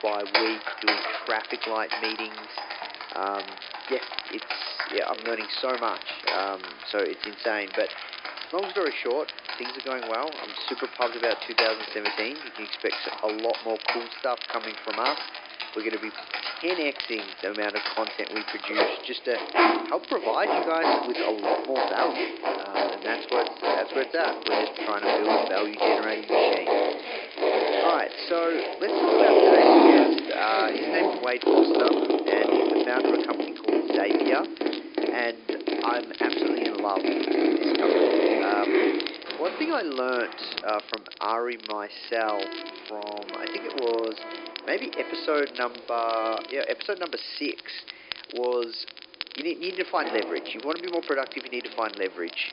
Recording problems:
thin; somewhat; fading below 300 Hz
high frequencies cut off; noticeable; nothing above 5 kHz
household noises; very loud; throughout; 4 dB above the speech
crackle, like an old record; loud; 9 dB below the speech
hiss; faint; throughout; 25 dB below the speech

